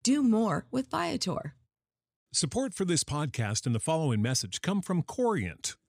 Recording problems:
none

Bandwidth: 15.5 kHz